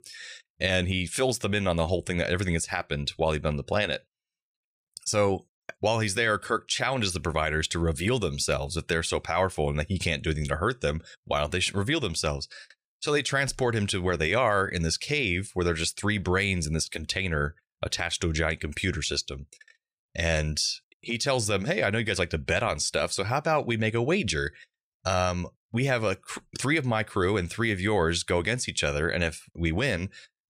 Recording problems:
none

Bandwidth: 14.5 kHz